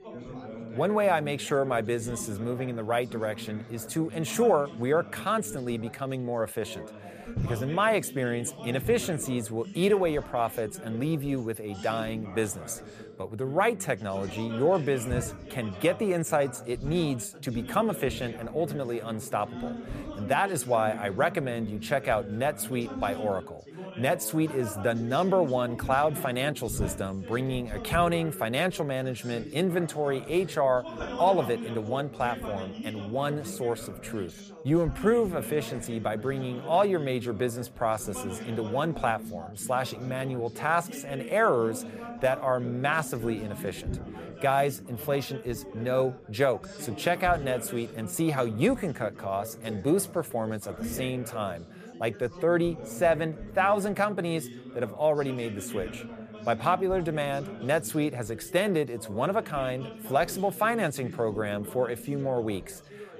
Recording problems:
background chatter; noticeable; throughout; 3 voices, 10 dB below the speech

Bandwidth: 14.5 kHz